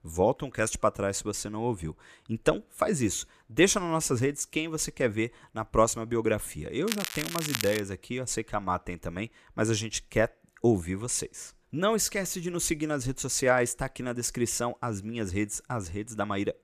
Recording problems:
crackling; loud; at 7 s; 4 dB below the speech

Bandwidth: 14.5 kHz